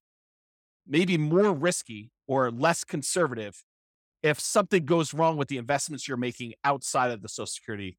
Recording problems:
none

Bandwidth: 17 kHz